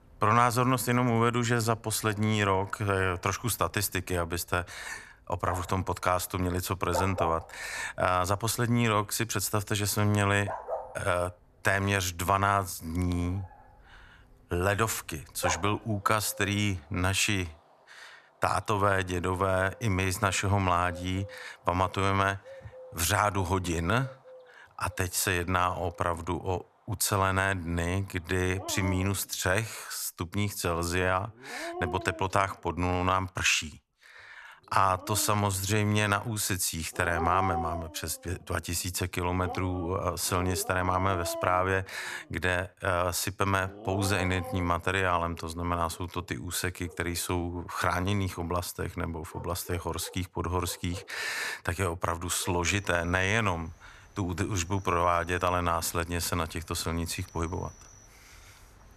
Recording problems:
animal sounds; noticeable; throughout; 15 dB below the speech

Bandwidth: 14 kHz